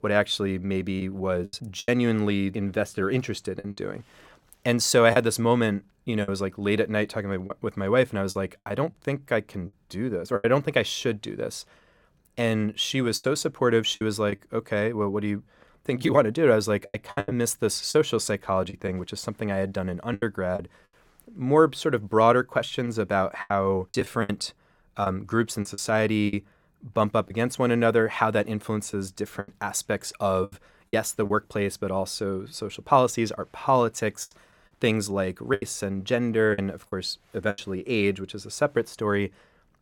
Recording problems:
choppy; very; 6% of the speech affected

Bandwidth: 17 kHz